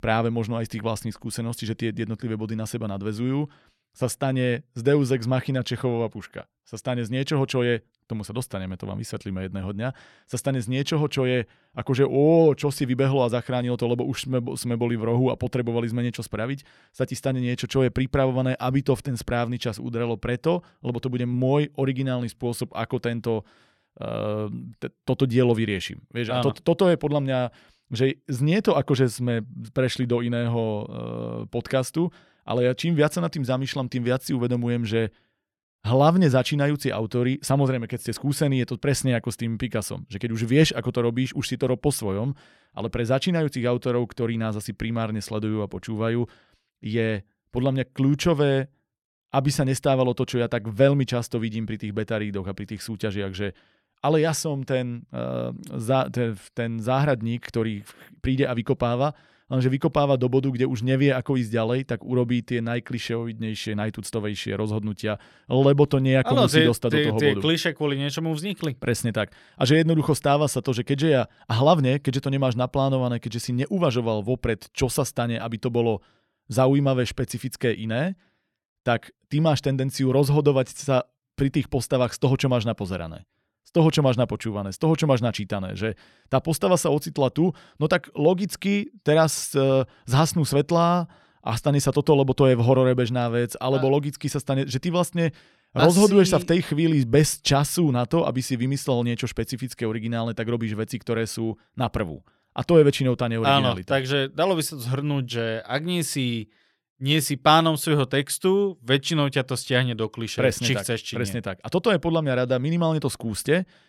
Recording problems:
none

